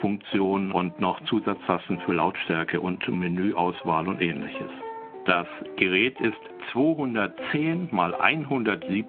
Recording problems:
phone-call audio
squashed, flat; somewhat, background pumping
background music; noticeable; throughout; 15 dB below the speech

